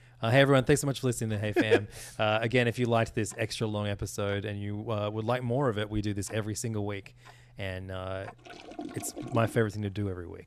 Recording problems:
household noises; noticeable; throughout; 20 dB below the speech

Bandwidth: 14 kHz